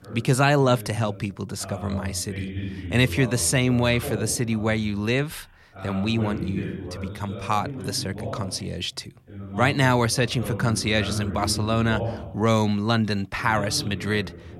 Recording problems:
voice in the background; noticeable; throughout; 10 dB below the speech

